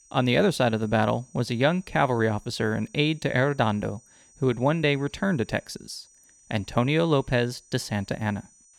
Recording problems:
high-pitched whine; faint; throughout; 6 kHz, 30 dB below the speech

